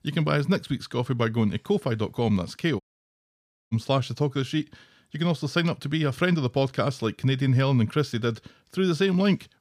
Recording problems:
audio cutting out; at 3 s for 1 s

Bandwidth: 15 kHz